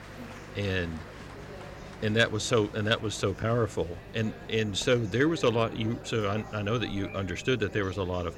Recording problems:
murmuring crowd; noticeable; throughout; 15 dB below the speech
electrical hum; faint; throughout; 50 Hz, 25 dB below the speech

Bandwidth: 16 kHz